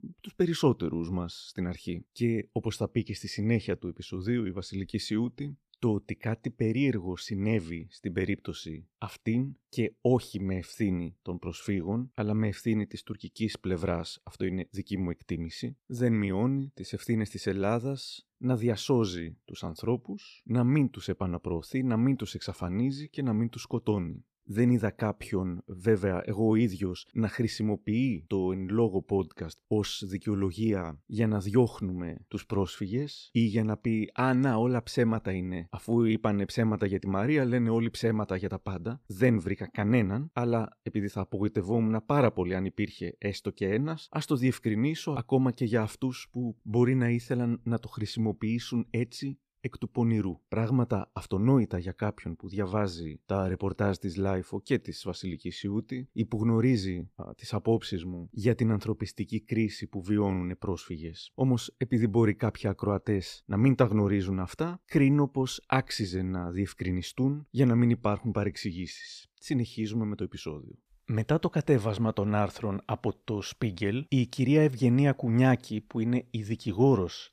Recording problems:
none

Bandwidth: 14.5 kHz